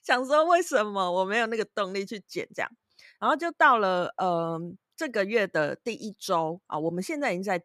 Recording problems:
none

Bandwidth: 14.5 kHz